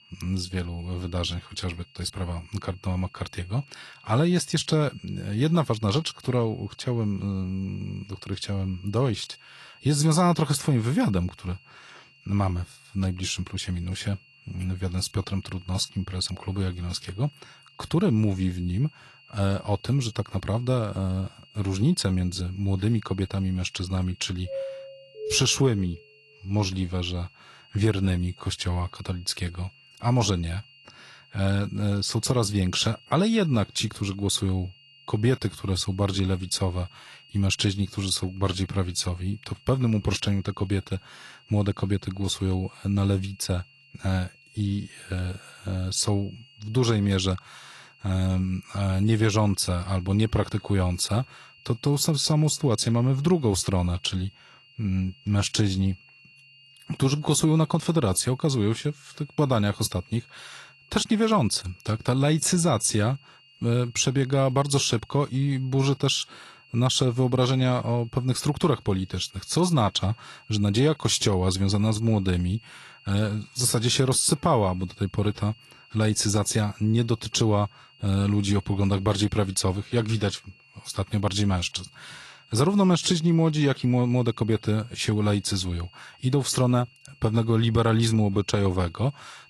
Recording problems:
garbled, watery; slightly; nothing above 11 kHz
high-pitched whine; faint; throughout; 3 kHz, 25 dB below the speech
doorbell; noticeable; from 24 to 26 s; peak 8 dB below the speech

